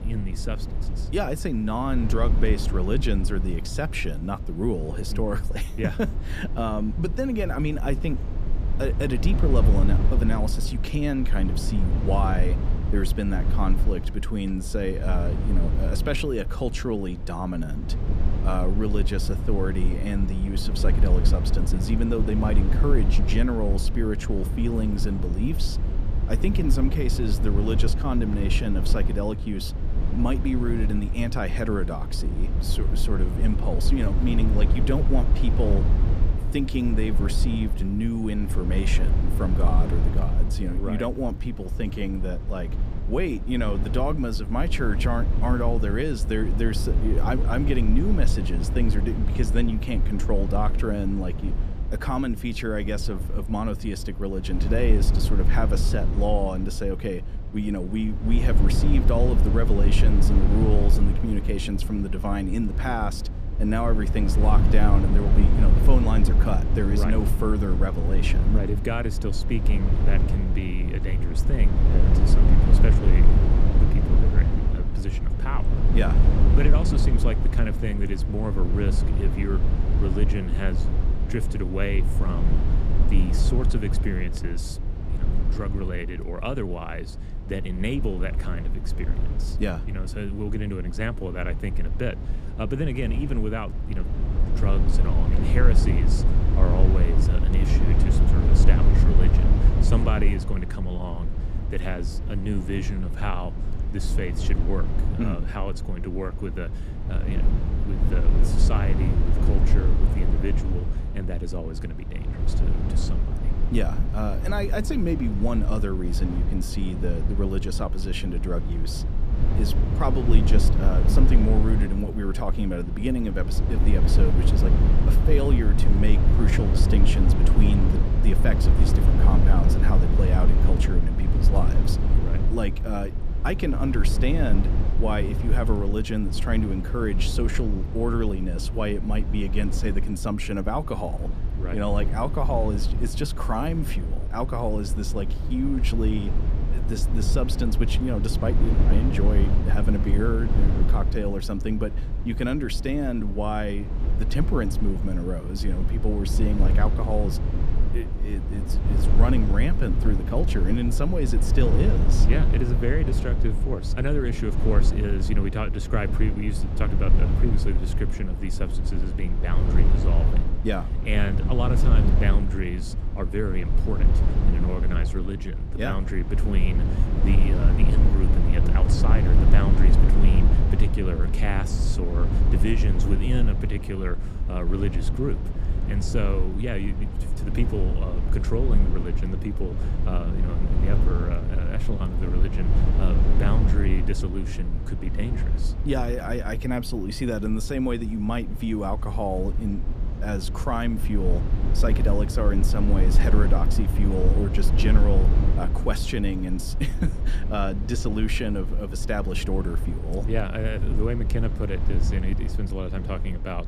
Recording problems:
low rumble; loud; throughout; 6 dB below the speech

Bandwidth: 14.5 kHz